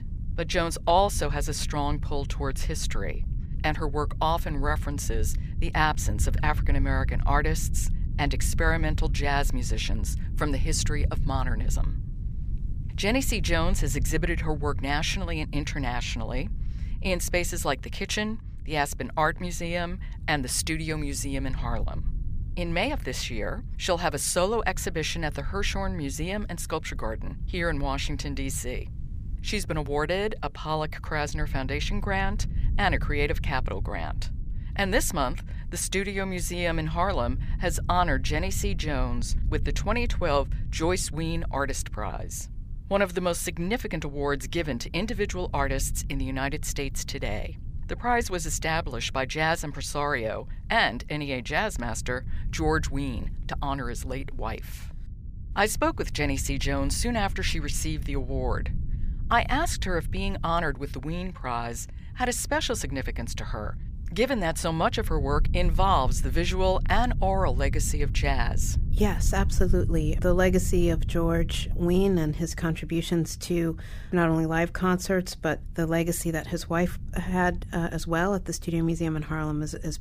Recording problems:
low rumble; faint; throughout; 20 dB below the speech

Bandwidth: 15 kHz